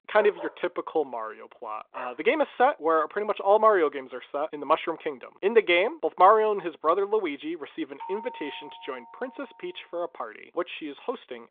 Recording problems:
phone-call audio; nothing above 3.5 kHz
dog barking; faint; until 2 s; peak 10 dB below the speech
doorbell; faint; from 8 to 9.5 s; peak 15 dB below the speech

